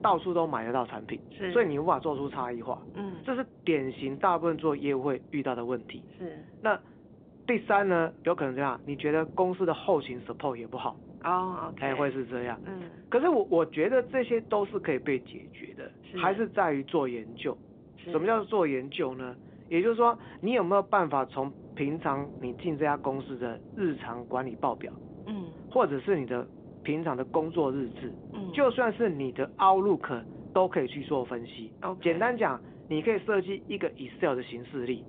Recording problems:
phone-call audio; nothing above 3.5 kHz
wind noise on the microphone; occasional gusts; 25 dB below the speech

